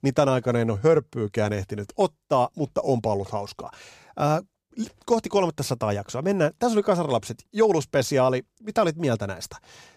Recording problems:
none

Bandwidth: 15 kHz